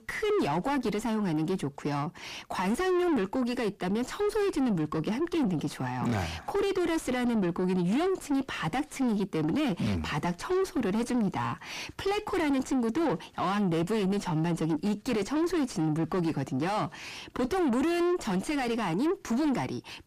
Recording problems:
distortion; heavy; 6 dB below the speech

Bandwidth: 15 kHz